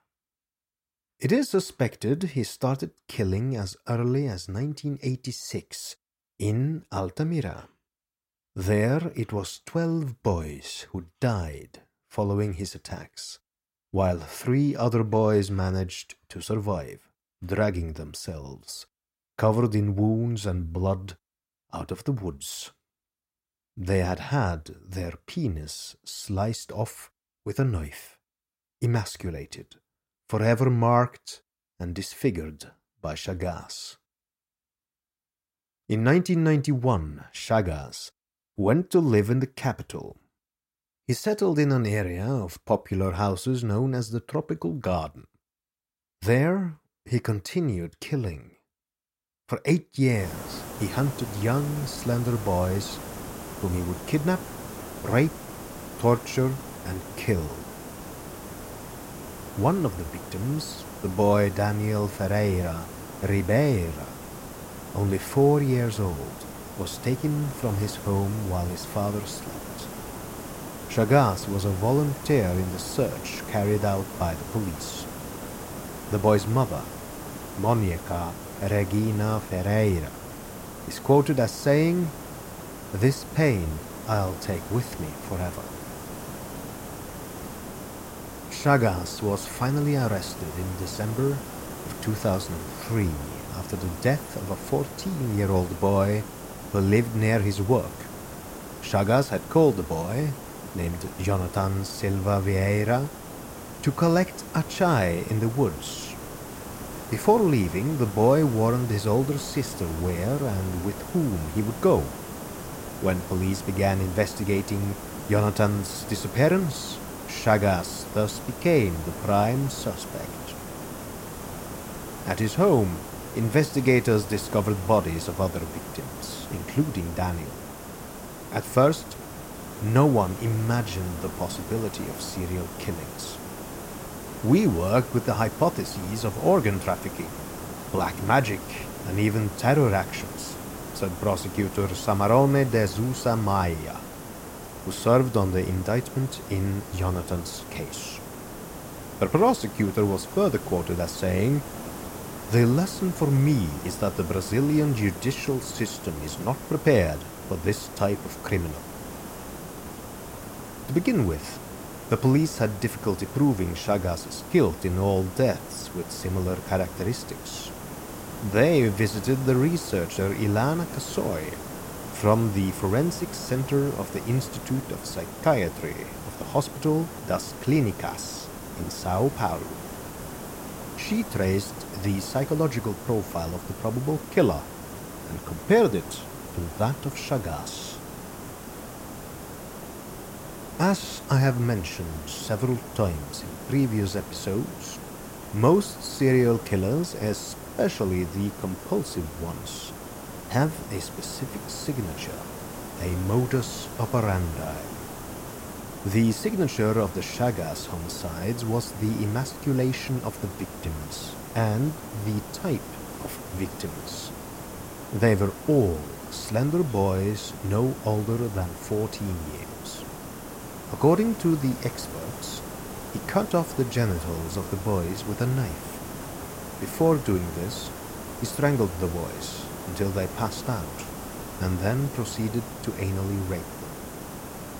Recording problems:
hiss; noticeable; from 50 s on; 10 dB below the speech

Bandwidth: 16 kHz